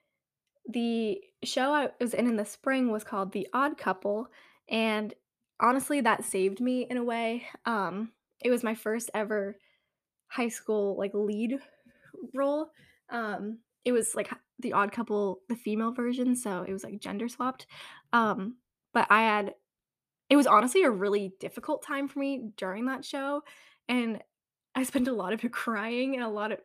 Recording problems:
none

